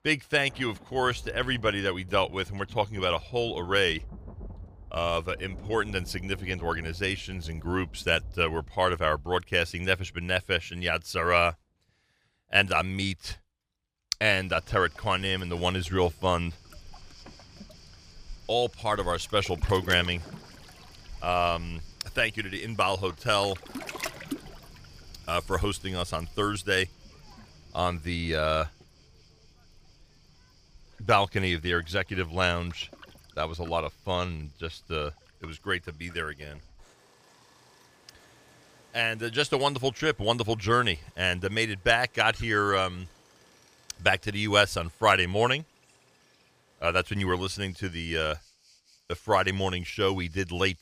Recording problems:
rain or running water; faint; throughout; 20 dB below the speech

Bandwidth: 15 kHz